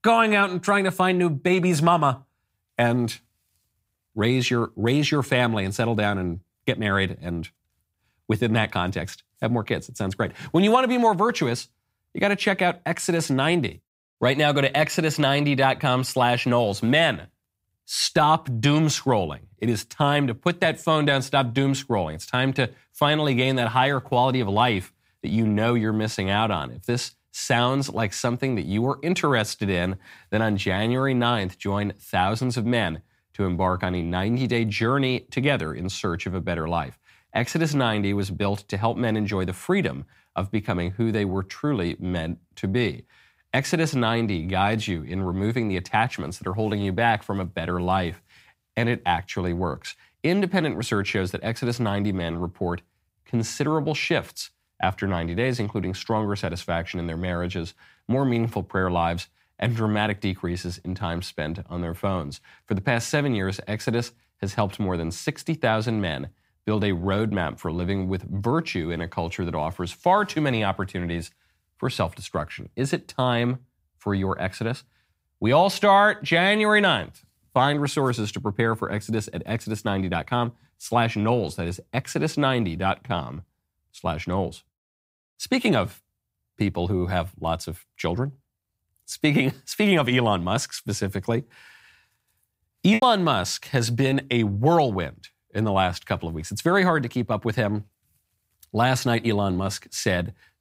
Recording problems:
choppy; very; from 1:33 to 1:34; 6% of the speech affected

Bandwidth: 15.5 kHz